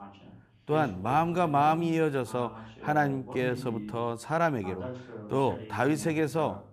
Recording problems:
voice in the background; noticeable; throughout; 15 dB below the speech

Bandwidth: 14.5 kHz